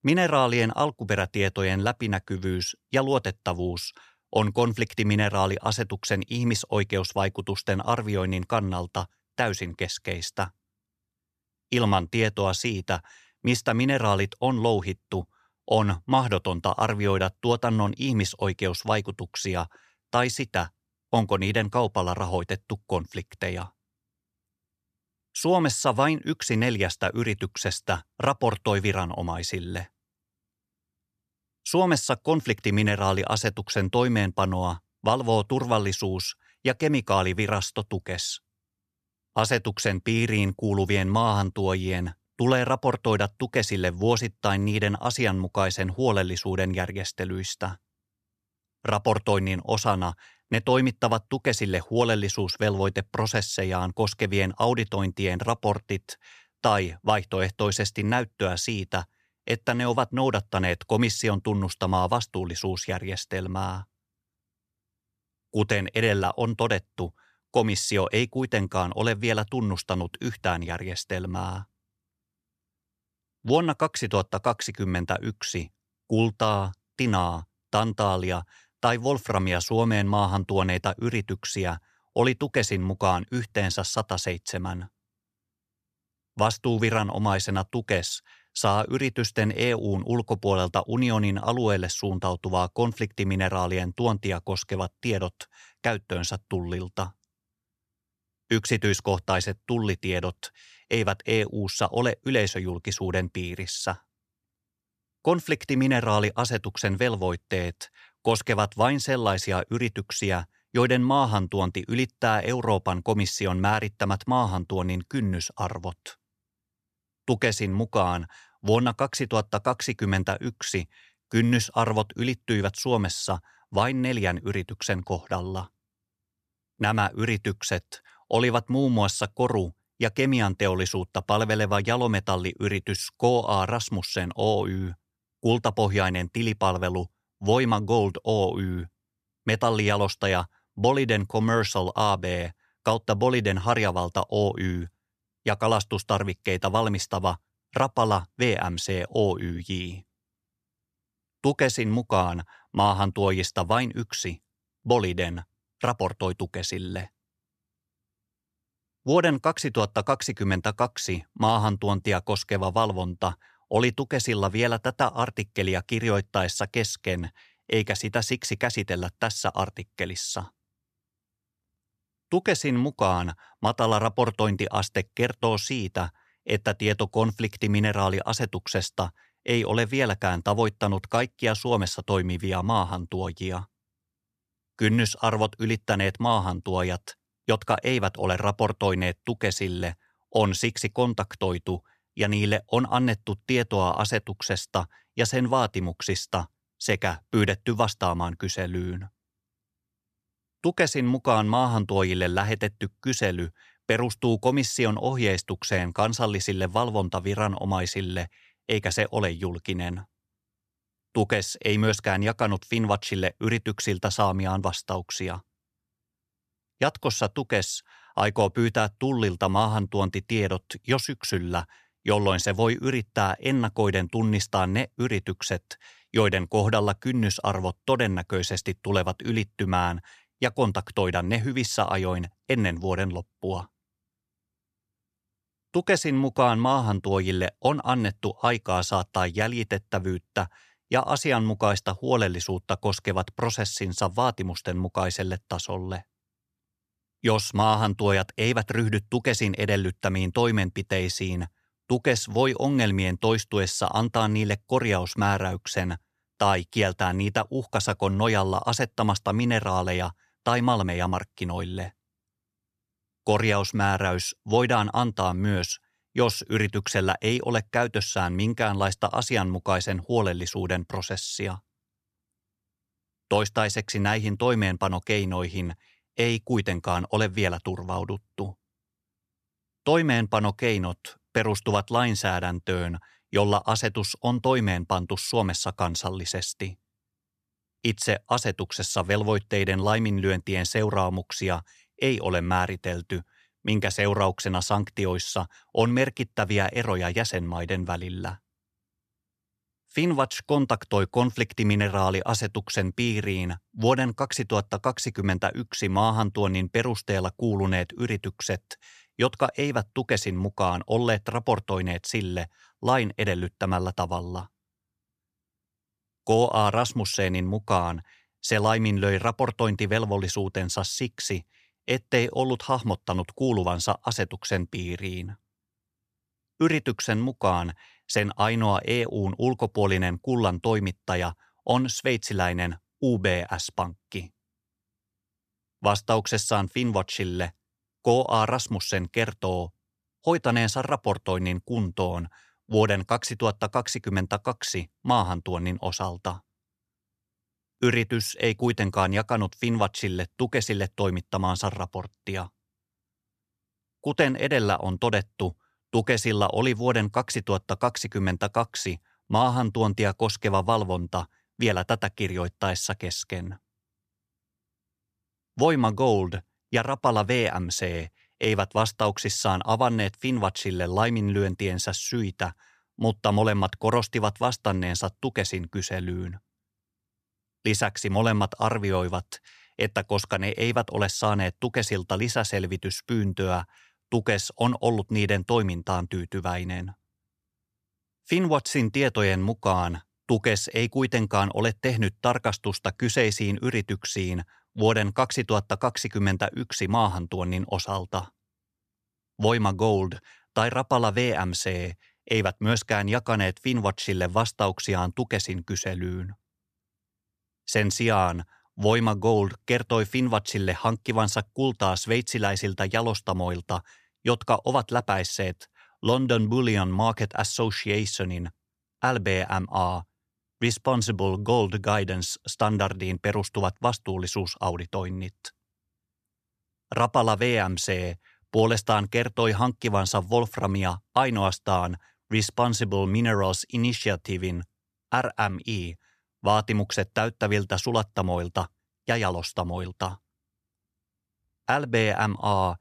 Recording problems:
none

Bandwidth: 14.5 kHz